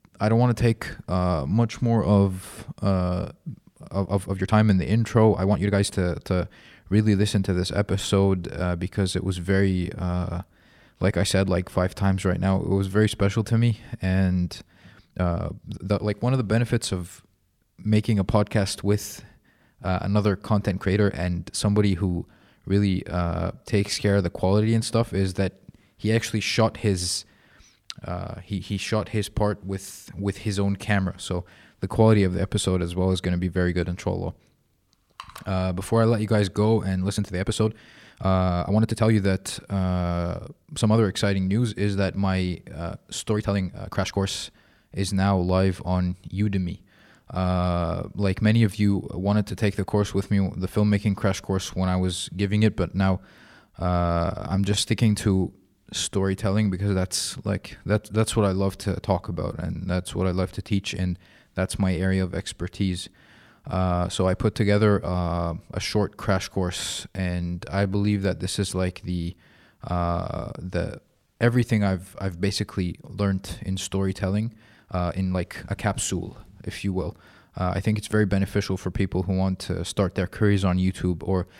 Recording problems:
uneven, jittery; strongly; from 4 s to 1:16

